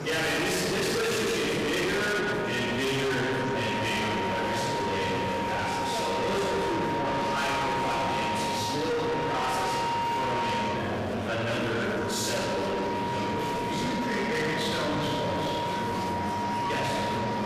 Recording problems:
distortion; heavy; 6 dB below the speech
room echo; strong; dies away in 2.2 s
off-mic speech; far
background music; loud; throughout; 2 dB below the speech
murmuring crowd; loud; throughout; 4 dB below the speech

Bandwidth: 14.5 kHz